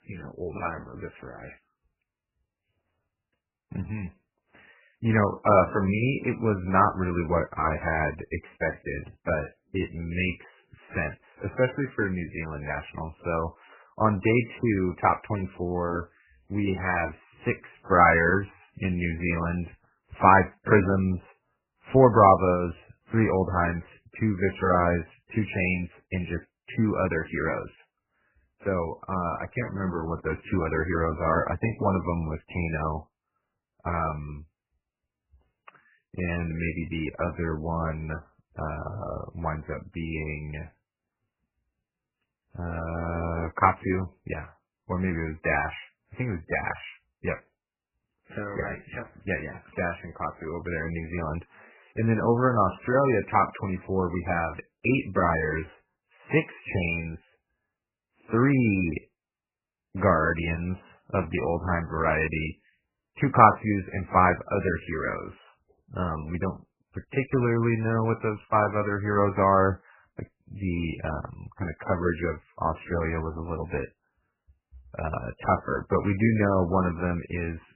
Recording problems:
garbled, watery; badly; nothing above 2.5 kHz

